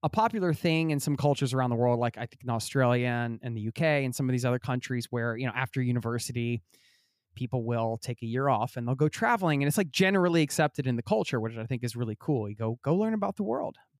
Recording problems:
none

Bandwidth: 15 kHz